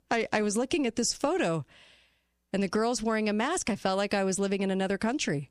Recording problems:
none

